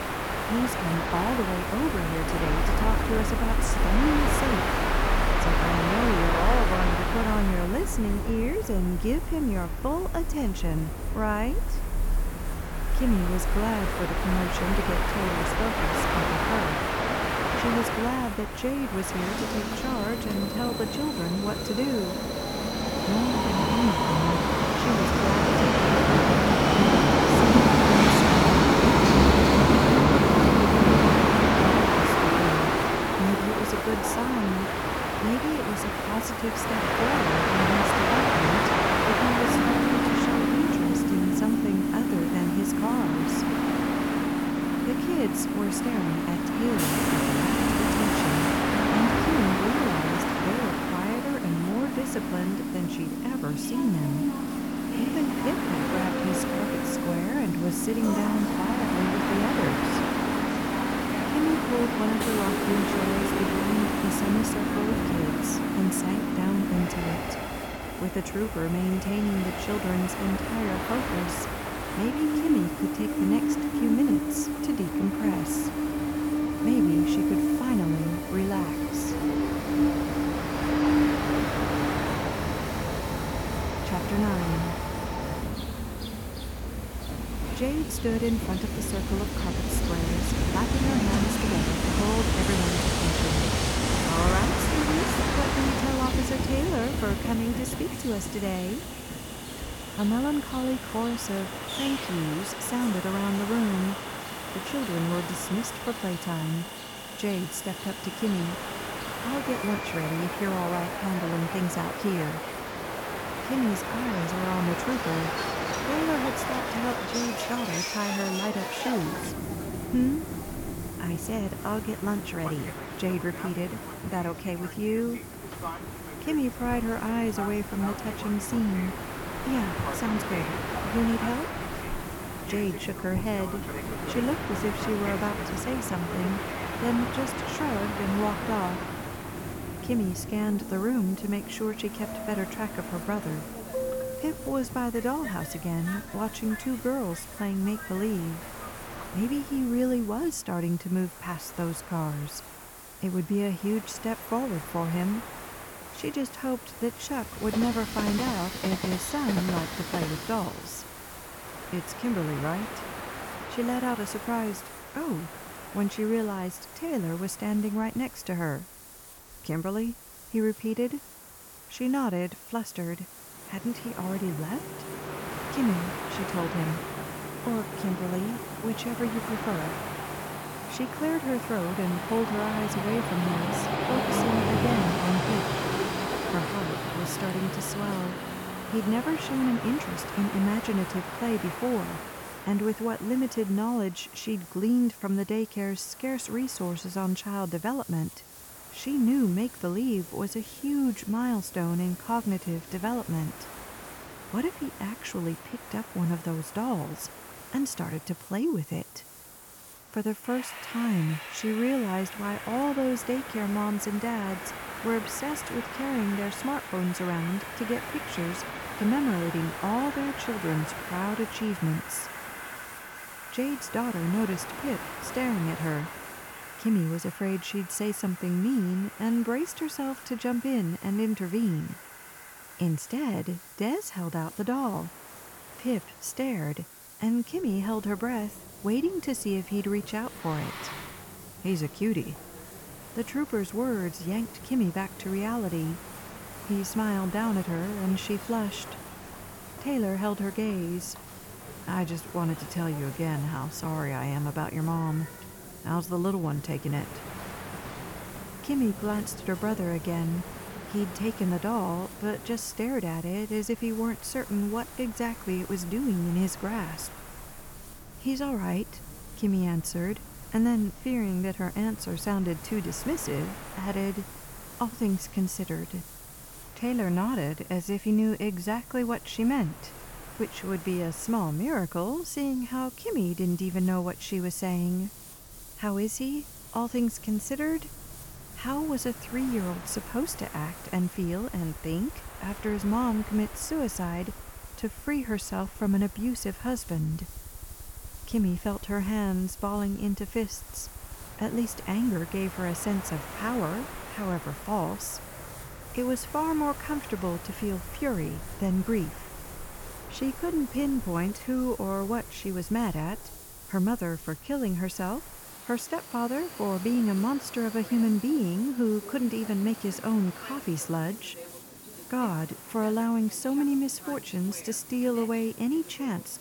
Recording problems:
train or aircraft noise; very loud; throughout; 2 dB above the speech
hiss; noticeable; throughout; 15 dB below the speech

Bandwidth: 18 kHz